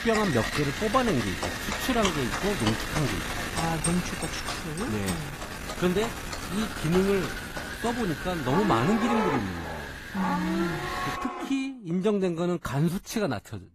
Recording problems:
garbled, watery; slightly; nothing above 14.5 kHz
wind noise on the microphone; heavy; until 11 s; 3 dB below the speech
animal sounds; loud; throughout; 6 dB below the speech

